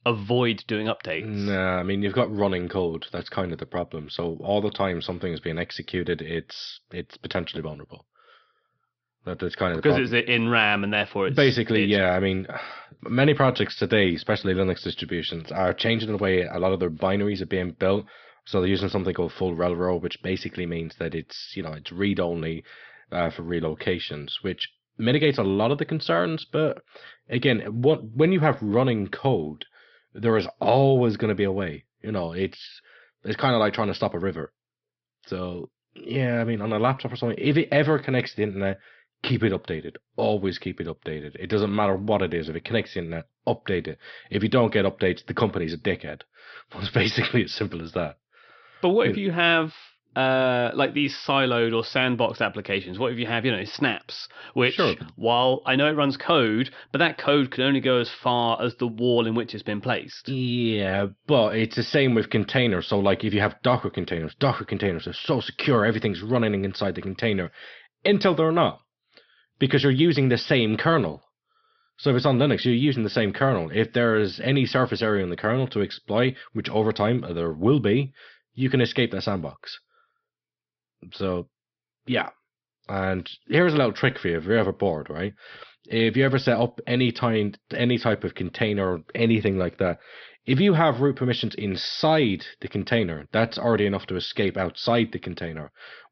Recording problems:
high frequencies cut off; noticeable; nothing above 5.5 kHz

